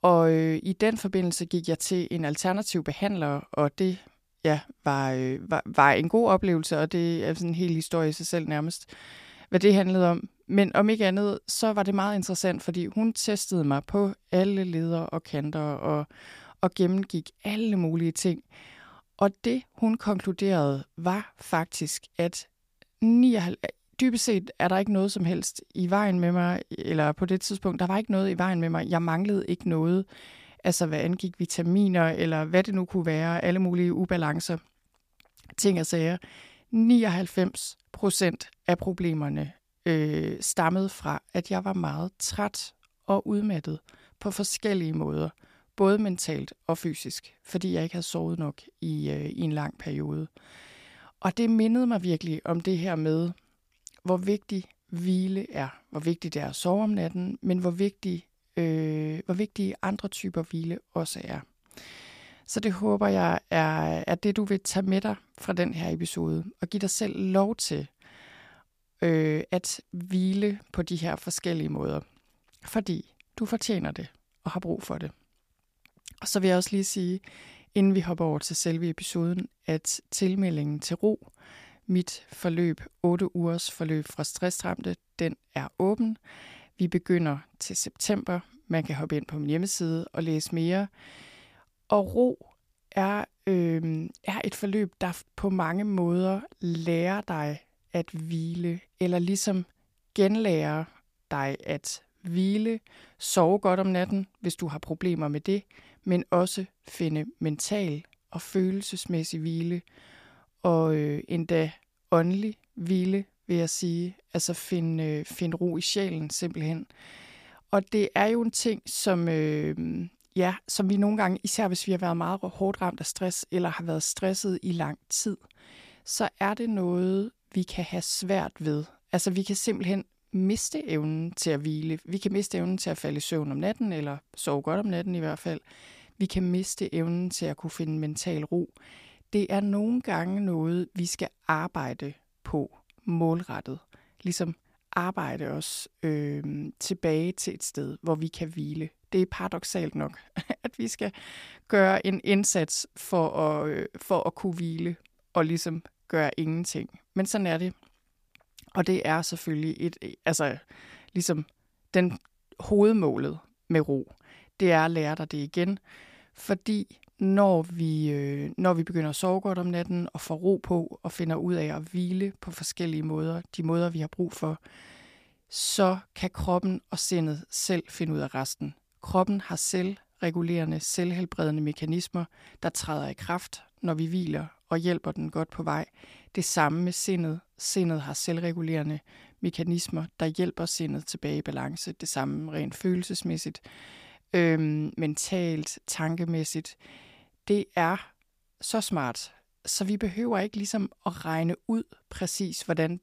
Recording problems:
none

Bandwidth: 15 kHz